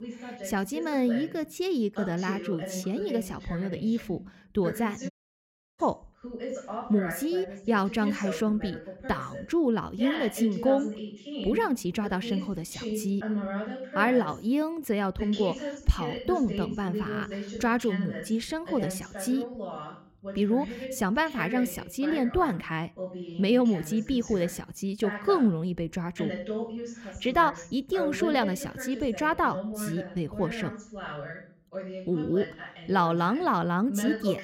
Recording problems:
voice in the background; loud; throughout; 9 dB below the speech
audio cutting out; at 5 s for 0.5 s

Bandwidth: 16 kHz